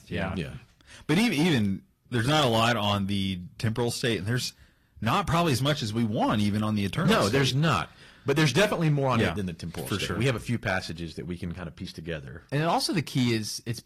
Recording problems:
distortion; slight; 5% of the sound clipped
garbled, watery; slightly

